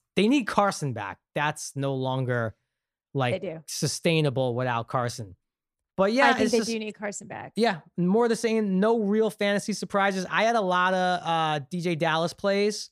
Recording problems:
none

